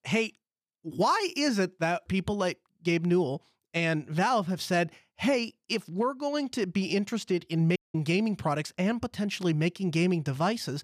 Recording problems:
audio cutting out; at 8 s

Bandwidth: 14 kHz